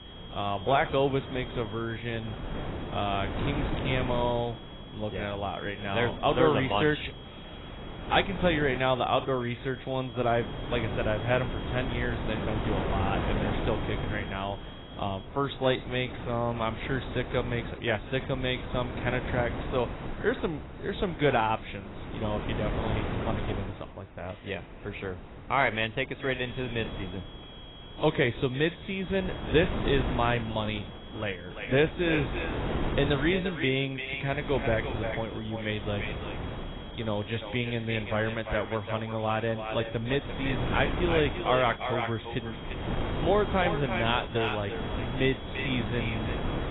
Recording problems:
echo of what is said; strong; from 31 s on; 350 ms later, 7 dB below the speech
garbled, watery; badly; nothing above 4 kHz
wind noise on the microphone; heavy; 9 dB below the speech
high-pitched whine; noticeable; until 15 s and from 26 s on; 3.5 kHz, 20 dB below the speech
traffic noise; faint; until 31 s; 25 dB below the speech

